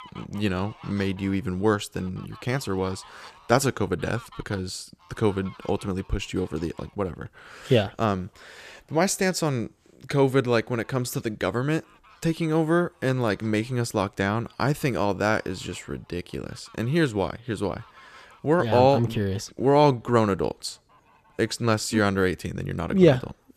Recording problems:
animal sounds; faint; throughout; 25 dB below the speech

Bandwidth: 14.5 kHz